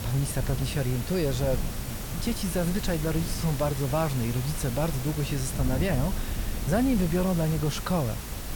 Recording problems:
hiss; loud; throughout; 9 dB below the speech
wind noise on the microphone; occasional gusts; 15 dB below the speech
high-pitched whine; faint; throughout; 5.5 kHz, 30 dB below the speech

